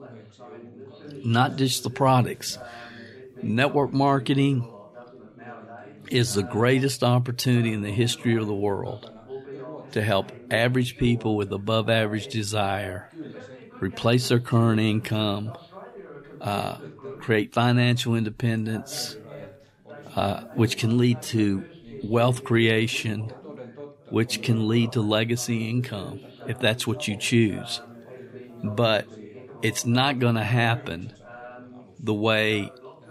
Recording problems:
background chatter; noticeable; throughout; 3 voices, 20 dB below the speech

